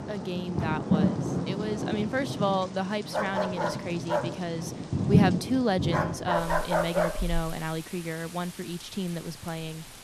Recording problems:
rain or running water; very loud; throughout; 1 dB above the speech
dog barking; loud; from 3 to 7 s; peak 5 dB above the speech

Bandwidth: 14 kHz